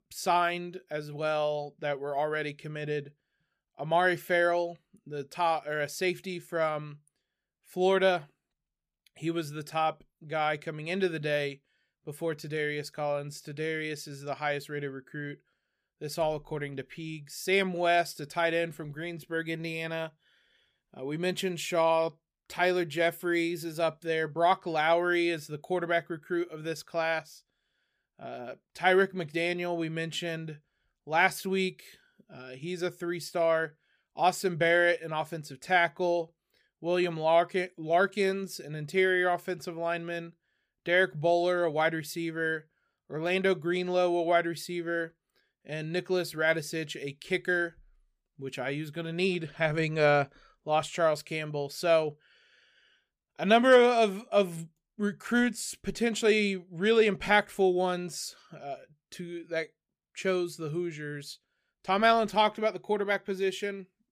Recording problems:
none

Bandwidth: 15 kHz